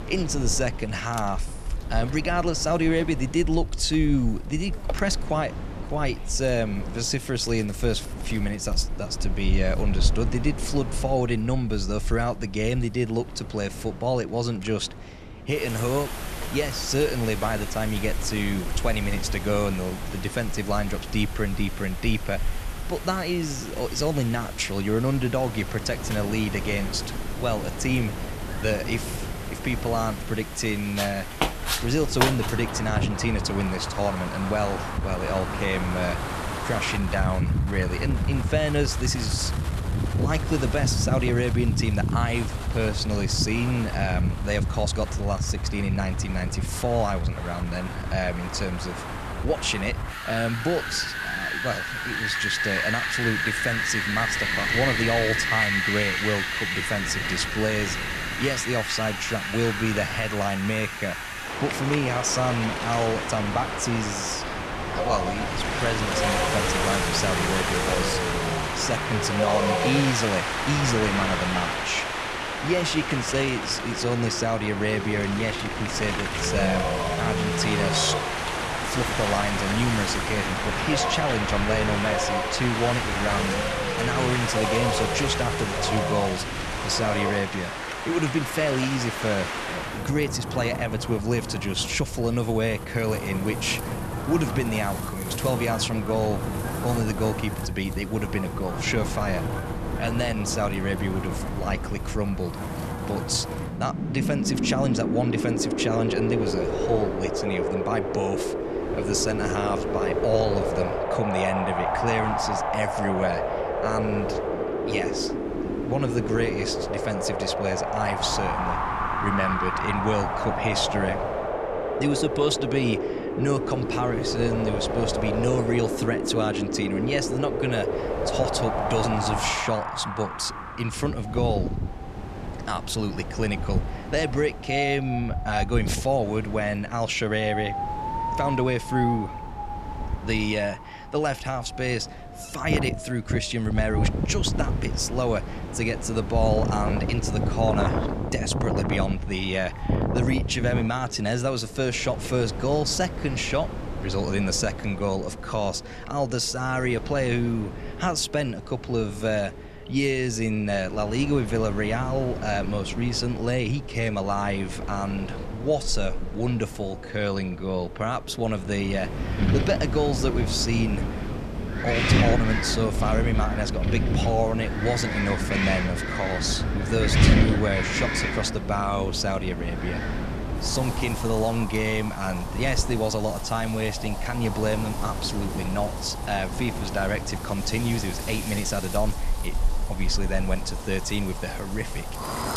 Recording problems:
wind in the background; loud; throughout; 1 dB below the speech

